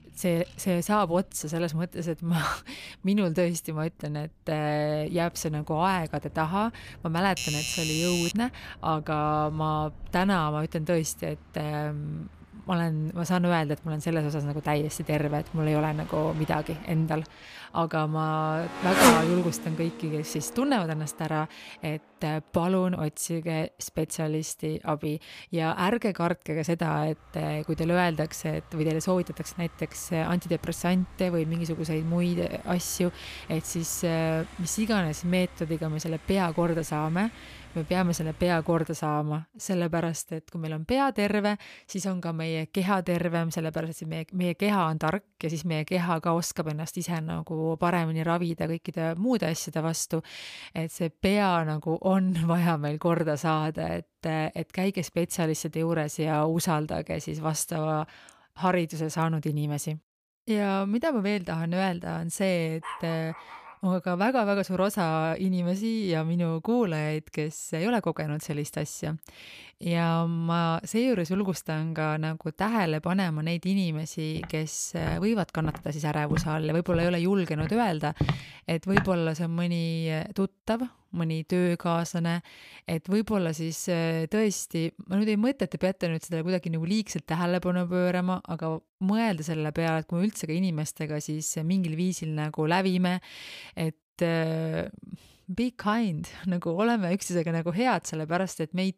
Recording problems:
traffic noise; loud; until 39 s; 6 dB below the speech
doorbell; noticeable; from 7.5 to 8.5 s; peak level with the speech
dog barking; faint; at 1:03; peak 10 dB below the speech
footsteps; noticeable; from 1:14 to 1:19; peak level with the speech

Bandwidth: 15 kHz